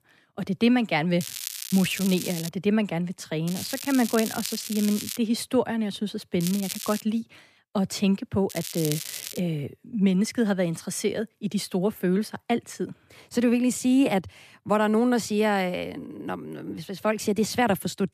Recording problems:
crackling; loud; 4 times, first at 1 s; 8 dB below the speech

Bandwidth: 14.5 kHz